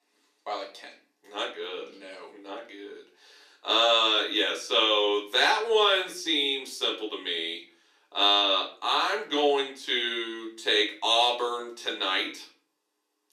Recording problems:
off-mic speech; far
thin; somewhat; fading below 300 Hz
room echo; slight; dies away in 0.4 s

